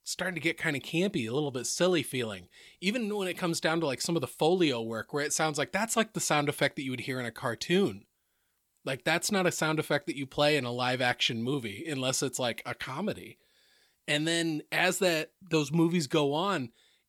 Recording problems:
none

